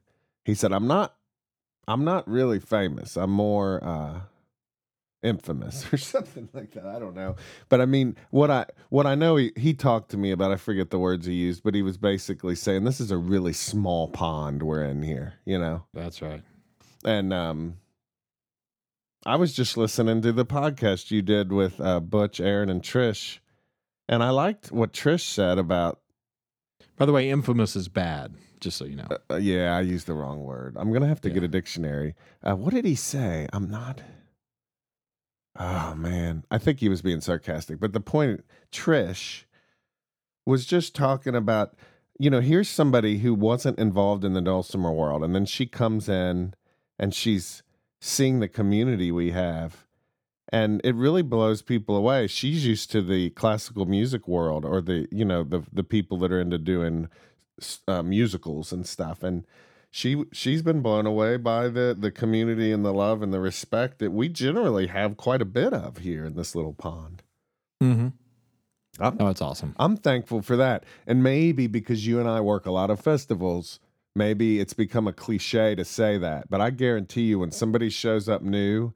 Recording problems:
none

